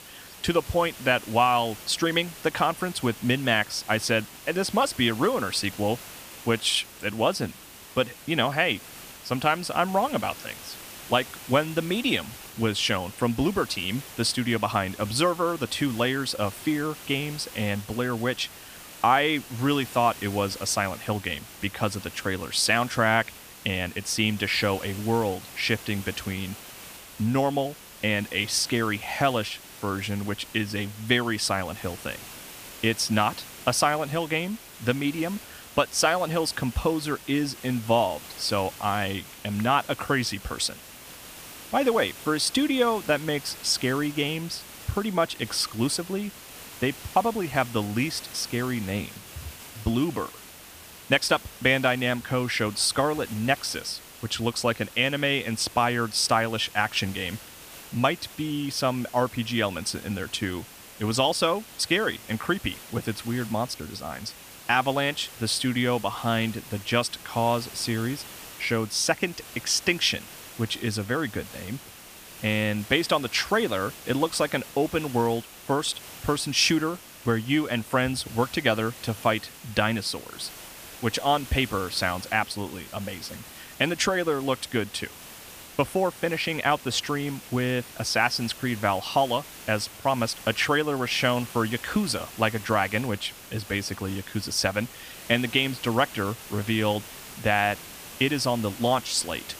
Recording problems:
hiss; noticeable; throughout; 15 dB below the speech

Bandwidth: 15 kHz